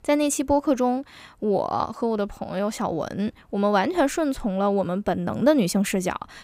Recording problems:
none

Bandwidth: 15.5 kHz